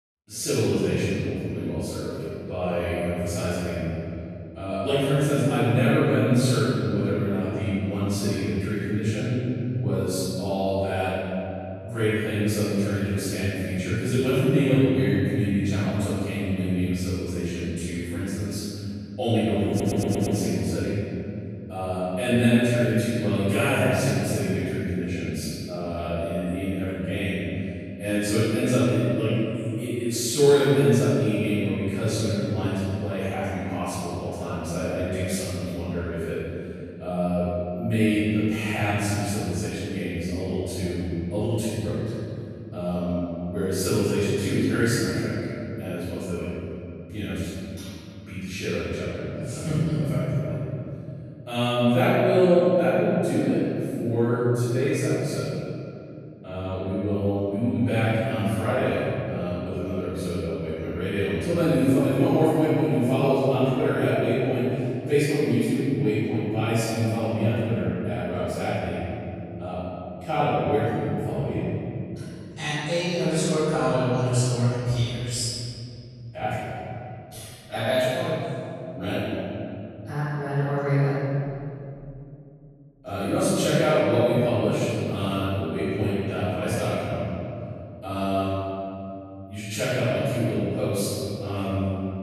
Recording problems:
room echo; strong; dies away in 2.9 s
off-mic speech; far
audio stuttering; at 20 s

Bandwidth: 13.5 kHz